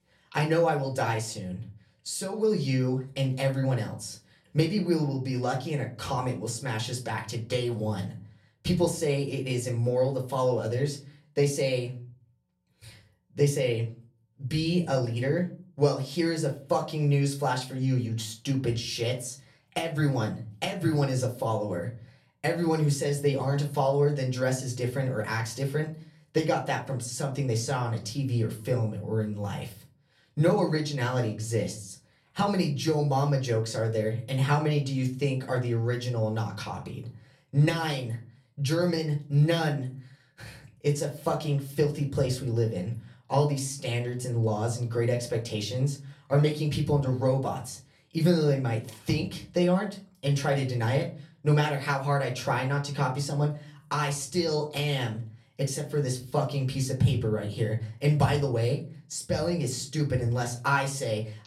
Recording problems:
off-mic speech; far
room echo; very slight; dies away in 0.3 s

